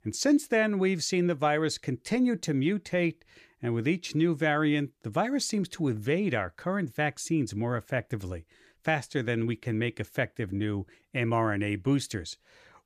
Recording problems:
none

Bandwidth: 14.5 kHz